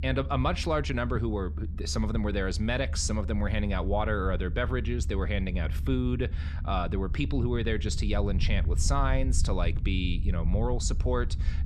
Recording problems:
low rumble; noticeable; throughout; 15 dB below the speech

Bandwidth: 13.5 kHz